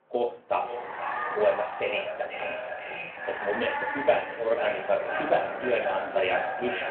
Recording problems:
echo of what is said; strong; throughout; 490 ms later, 5 dB below the speech
muffled; very; fading above 2.5 kHz
room echo; slight; dies away in 0.4 s
phone-call audio
off-mic speech; somewhat distant
animal sounds; loud; throughout; 7 dB below the speech

